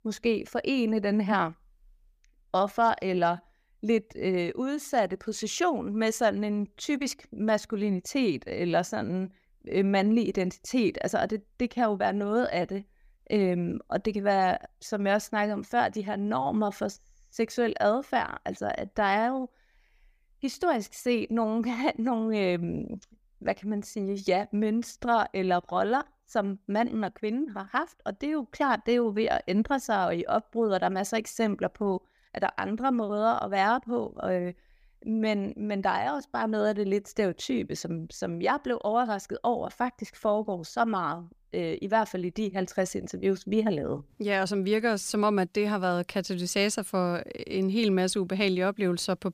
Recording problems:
none

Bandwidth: 15 kHz